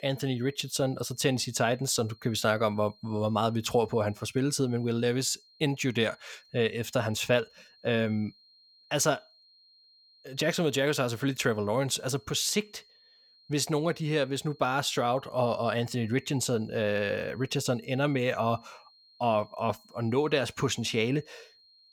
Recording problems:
high-pitched whine; faint; throughout; 4 kHz, 30 dB below the speech

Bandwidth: 17.5 kHz